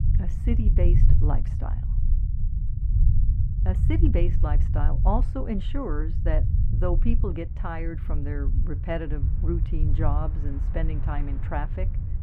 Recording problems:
muffled; very; fading above 4 kHz
low rumble; loud; throughout; 8 dB below the speech
train or aircraft noise; faint; throughout; 20 dB below the speech

